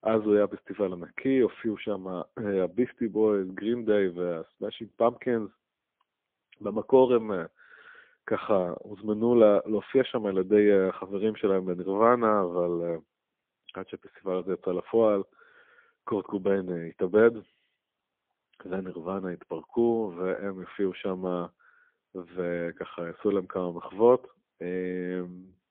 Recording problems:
phone-call audio; poor line; nothing above 3.5 kHz

